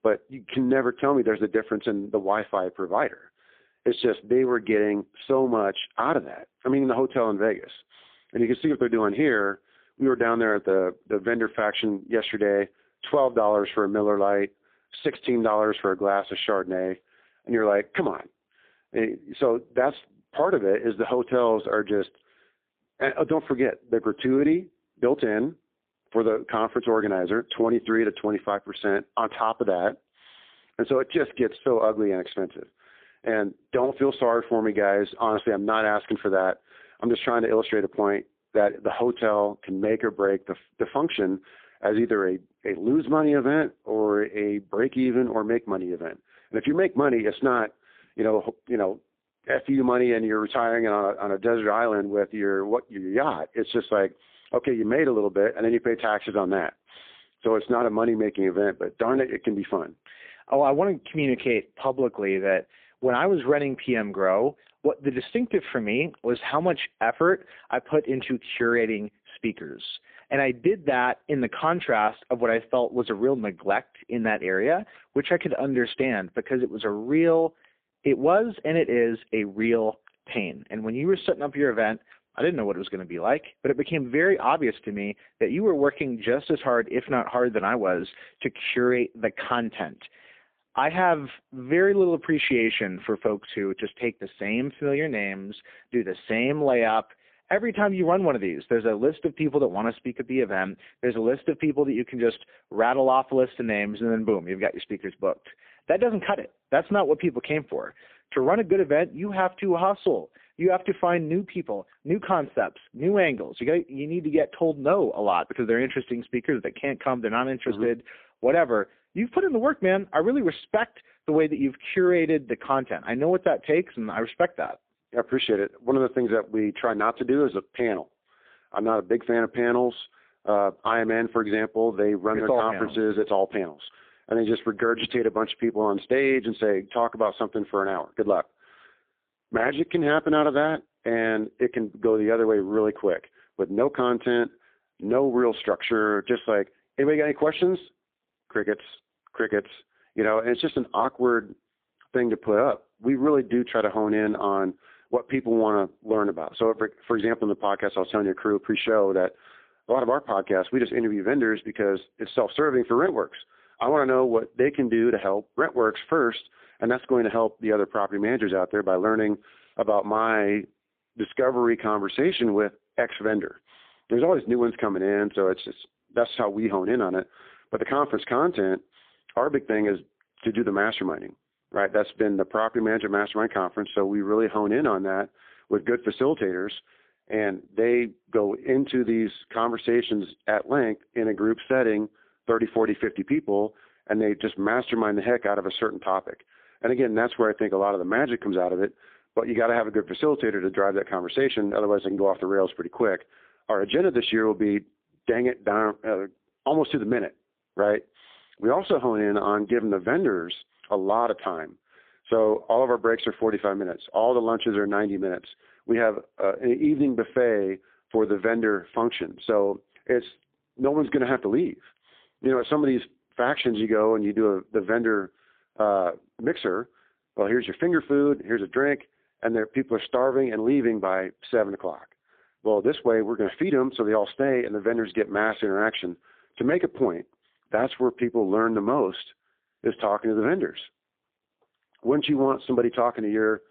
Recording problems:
phone-call audio; poor line

